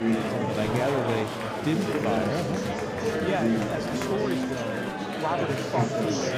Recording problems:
murmuring crowd; very loud; throughout; 3 dB above the speech

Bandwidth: 15.5 kHz